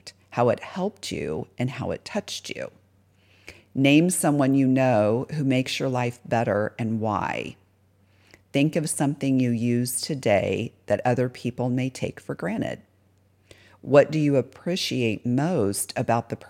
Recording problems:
none

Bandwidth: 16.5 kHz